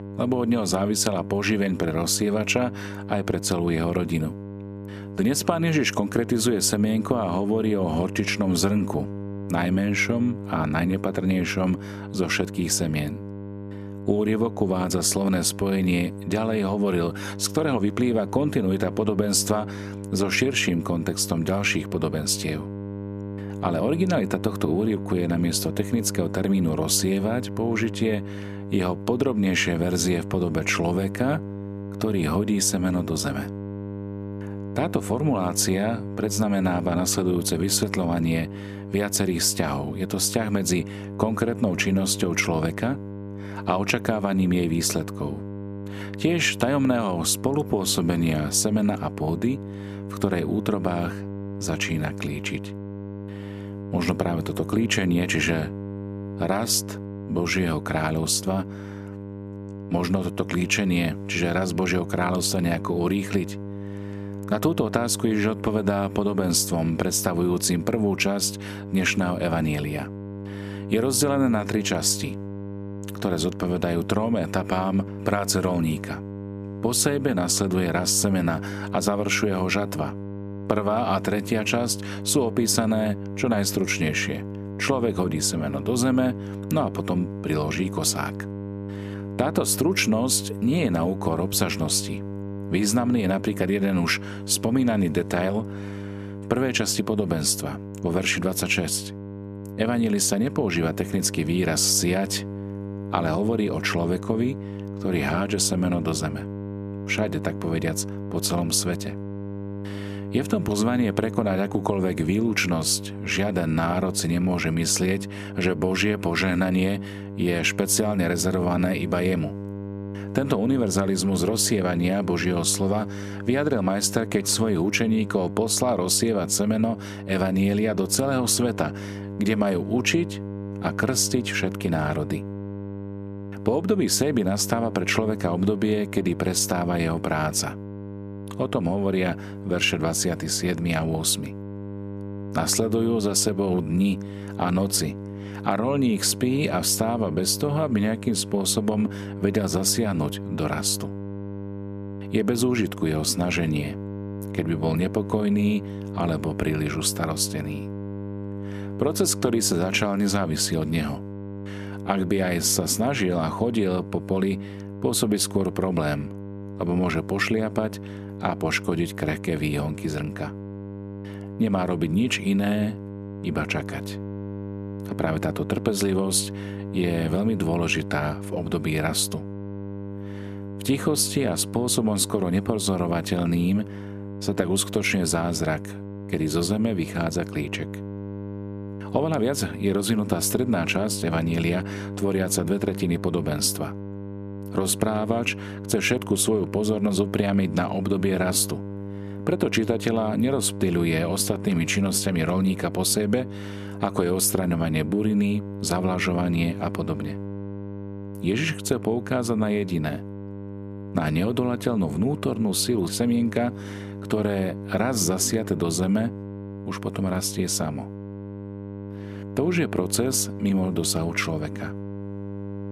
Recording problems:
electrical hum; noticeable; throughout; 50 Hz, 15 dB below the speech

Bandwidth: 14.5 kHz